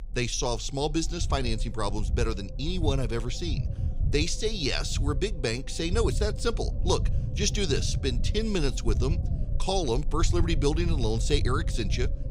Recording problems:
low rumble; noticeable; throughout; 15 dB below the speech

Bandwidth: 15.5 kHz